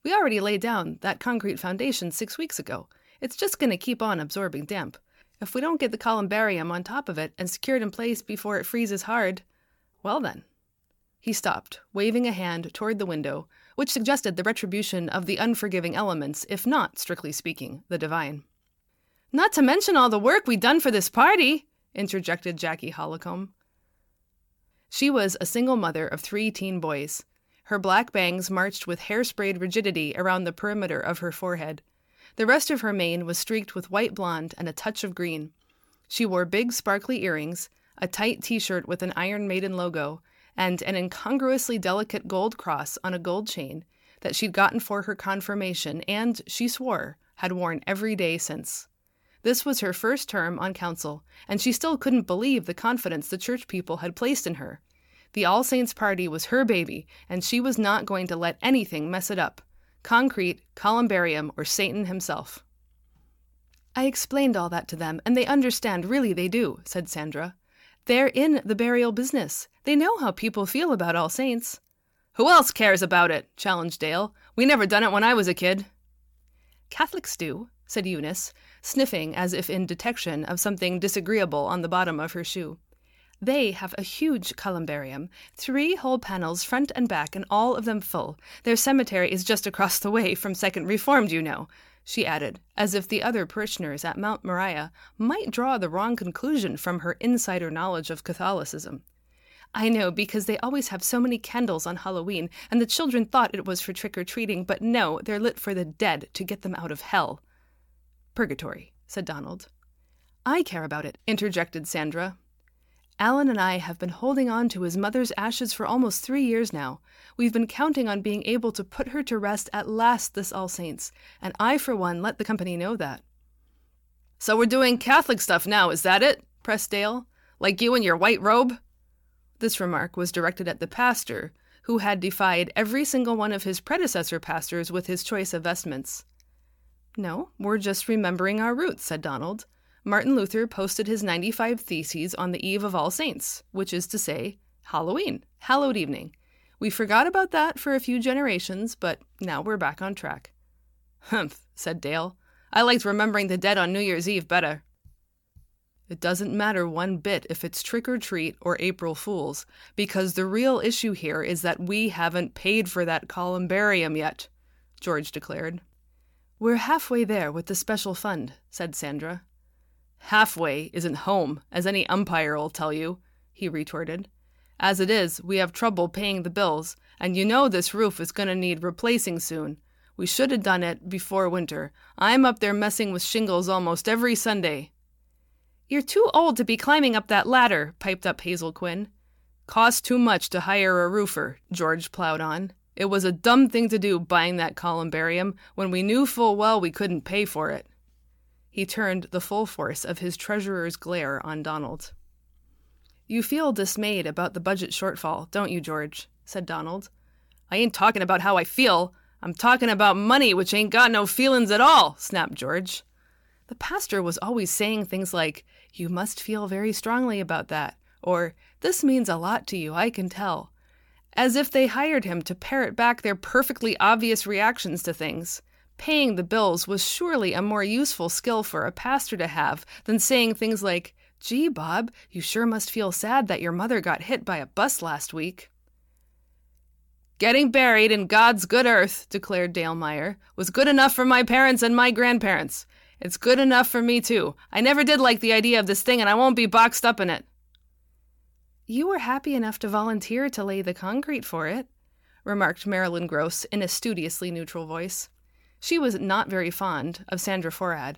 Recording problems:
uneven, jittery; strongly; from 8 s to 4:04

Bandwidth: 17.5 kHz